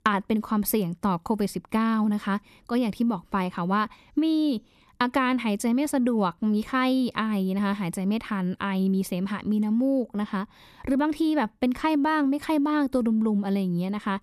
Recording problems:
none

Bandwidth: 13.5 kHz